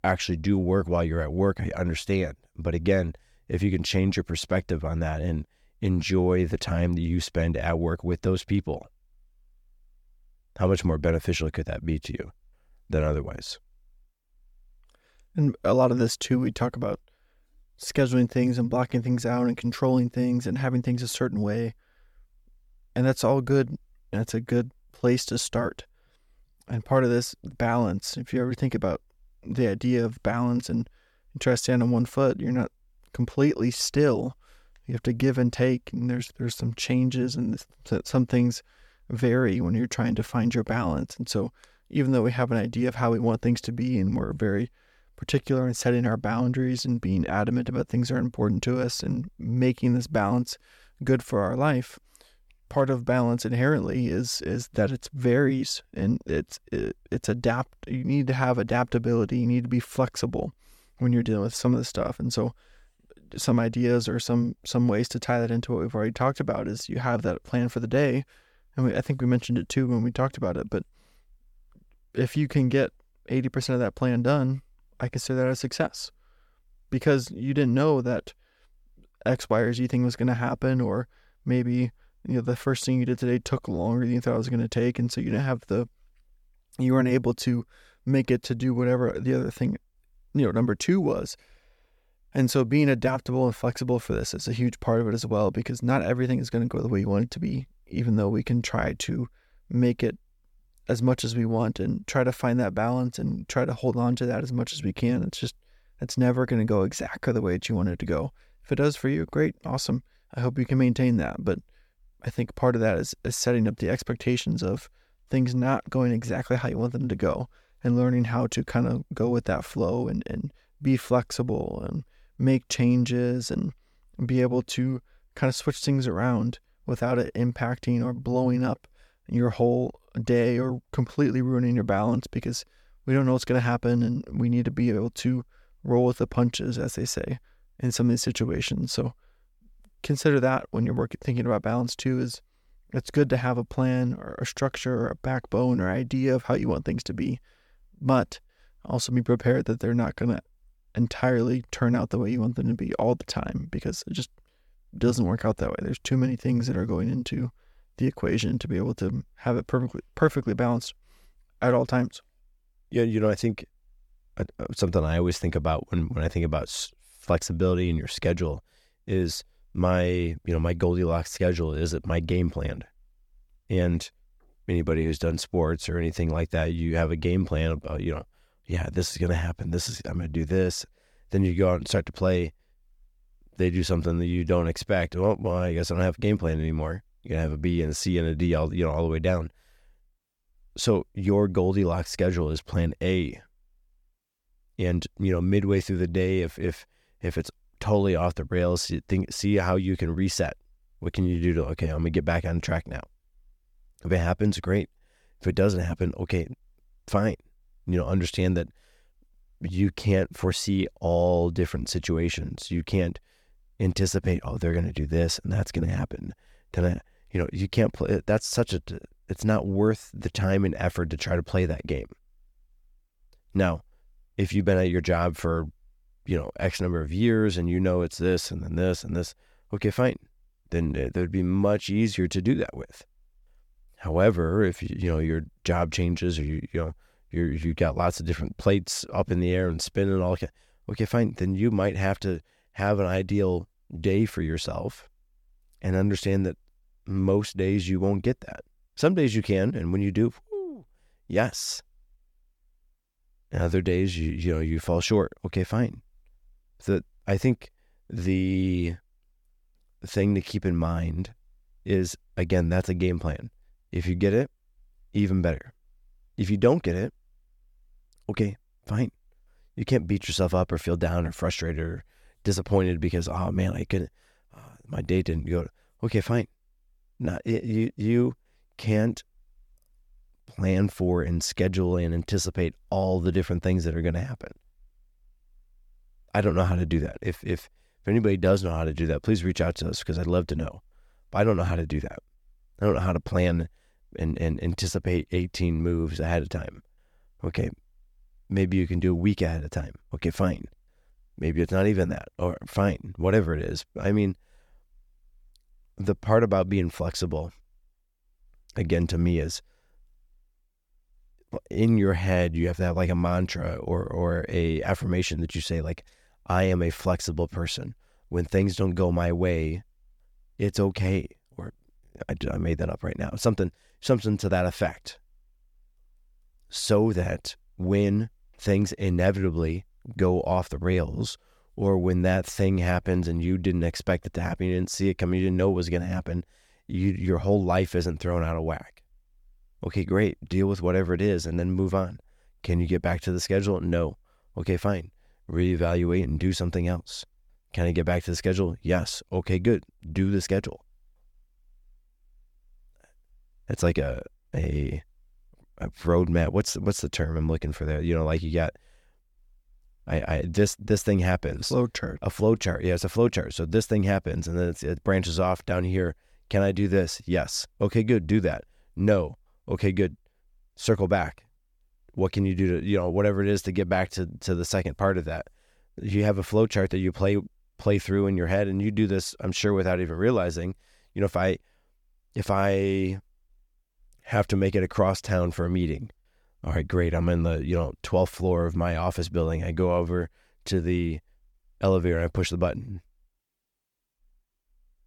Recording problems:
none

